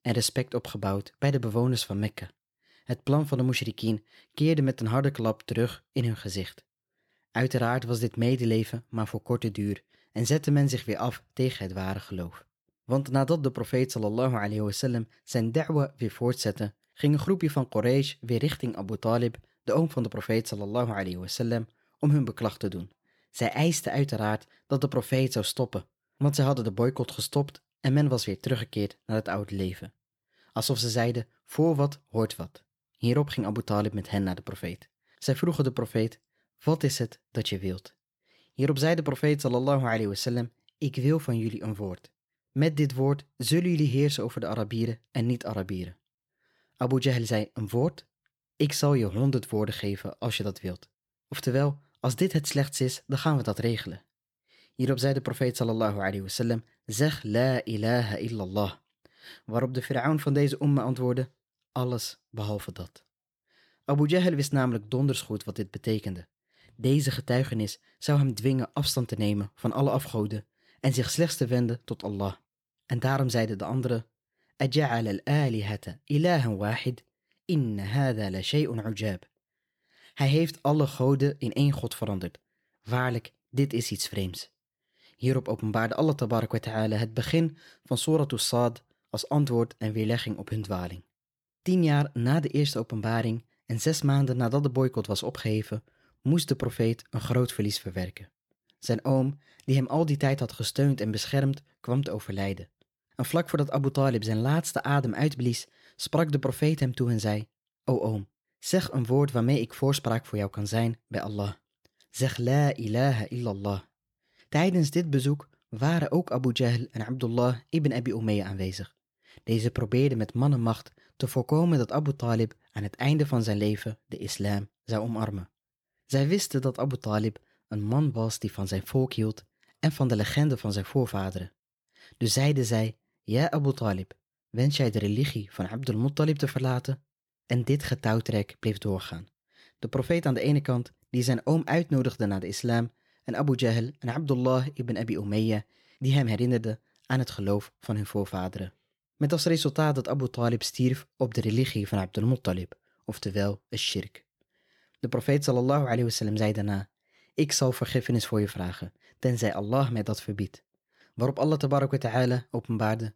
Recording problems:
none

